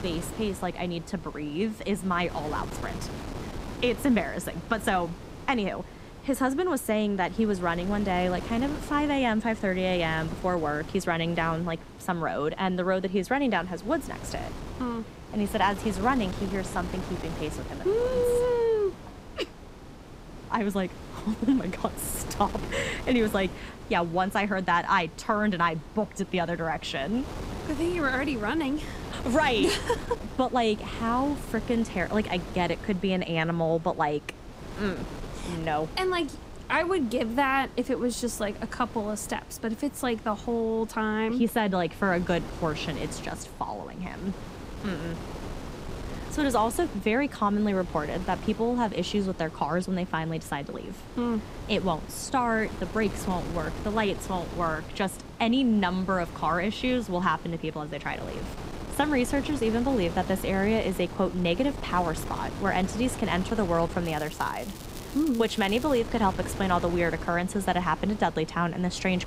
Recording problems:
wind noise on the microphone; occasional gusts; 15 dB below the speech
crackling; noticeable; from 1:04 to 1:06; 15 dB below the speech

